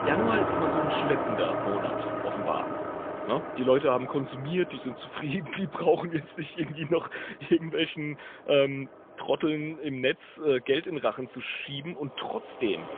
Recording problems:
phone-call audio; poor line; nothing above 3.5 kHz
traffic noise; loud; throughout; 2 dB below the speech

